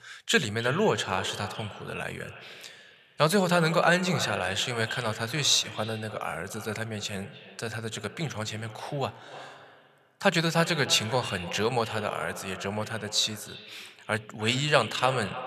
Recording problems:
echo of what is said; noticeable; throughout; 300 ms later, 15 dB below the speech

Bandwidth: 14 kHz